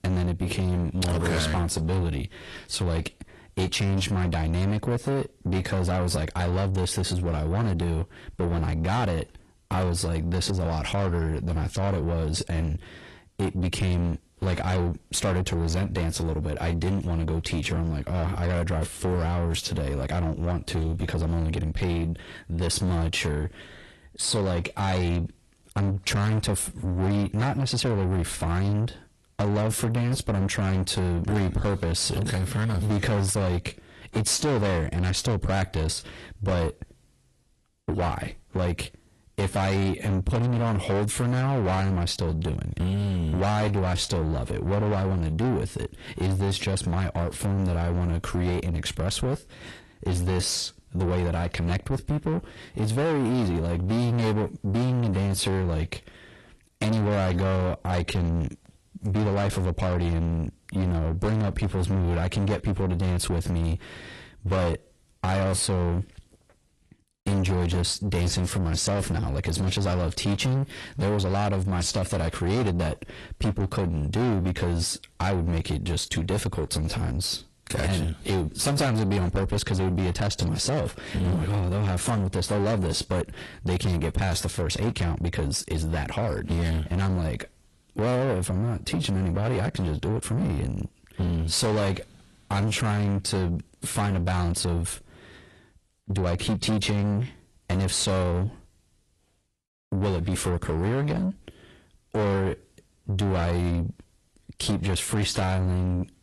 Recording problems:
distortion; heavy; 7 dB below the speech
garbled, watery; slightly; nothing above 11.5 kHz

